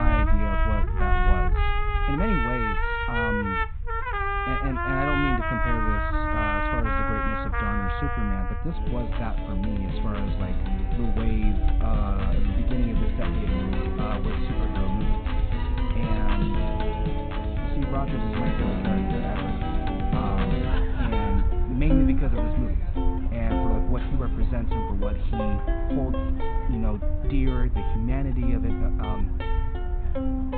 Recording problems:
high frequencies cut off; severe; nothing above 4 kHz
muffled; very slightly; fading above 4 kHz
background music; very loud; throughout; 2 dB above the speech
low rumble; noticeable; throughout; 15 dB below the speech
abrupt cut into speech; at the start

